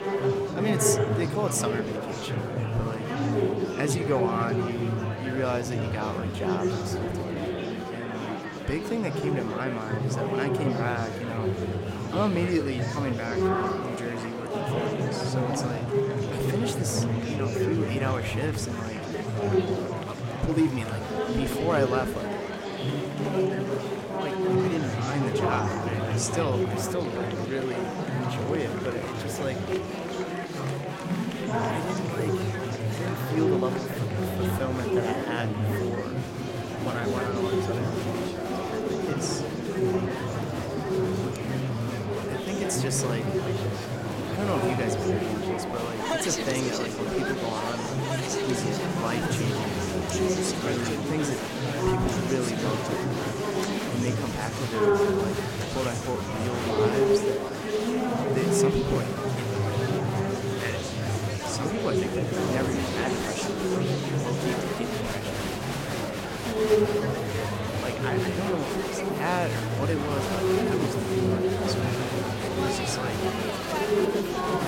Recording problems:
murmuring crowd; very loud; throughout; 4 dB above the speech

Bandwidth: 16.5 kHz